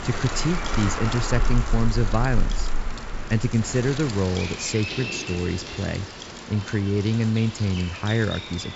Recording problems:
high frequencies cut off; noticeable; nothing above 8 kHz
wind noise on the microphone; heavy; 7 dB below the speech
animal sounds; loud; throughout; 7 dB below the speech
traffic noise; faint; throughout; 25 dB below the speech

